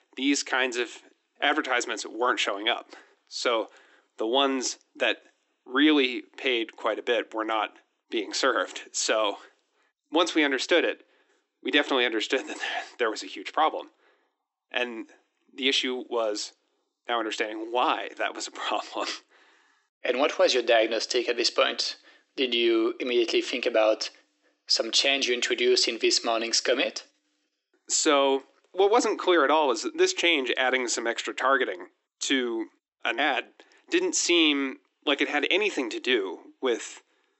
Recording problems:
thin; somewhat; fading below 300 Hz
high frequencies cut off; noticeable; nothing above 8 kHz

